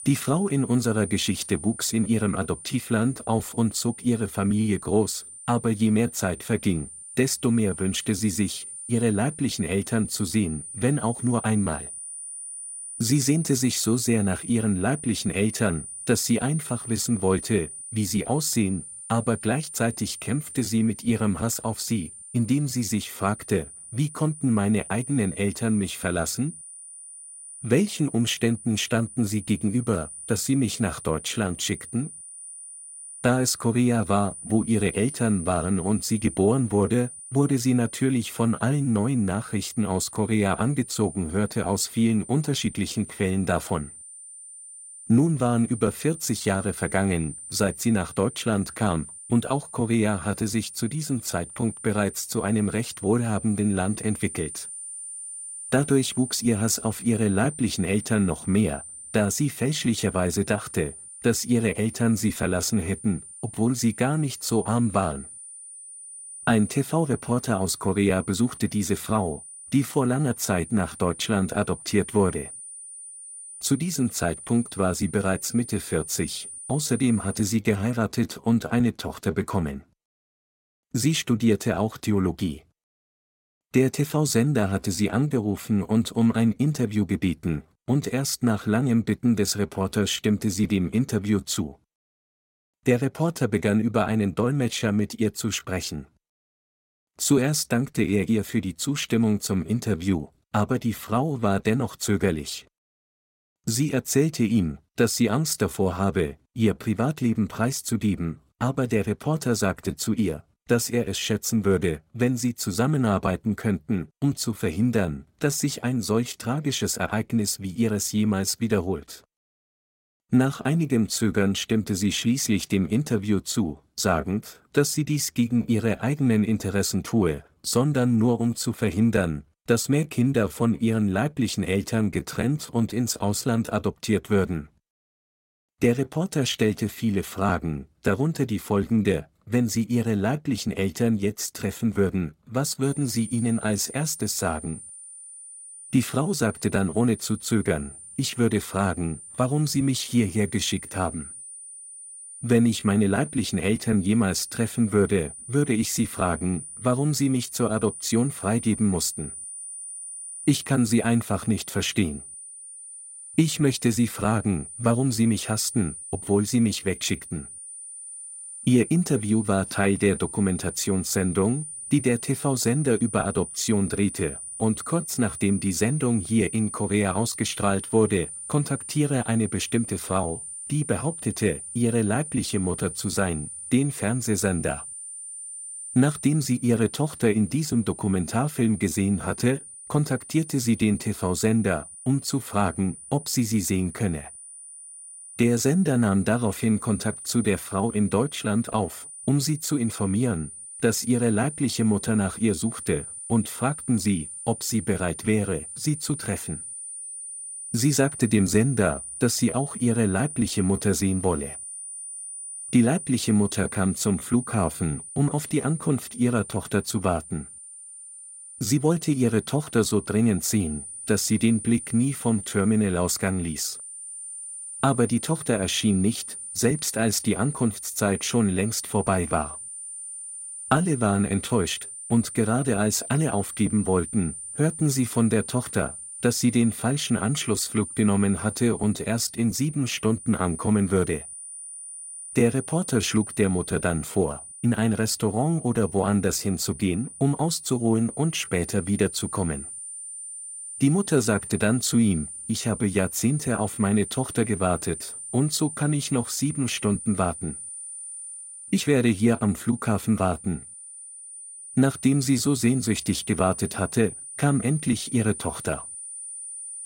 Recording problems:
high-pitched whine; noticeable; until 1:17 and from 2:23 on; 9.5 kHz, 10 dB below the speech

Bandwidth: 16 kHz